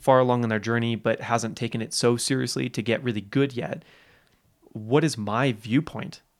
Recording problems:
none

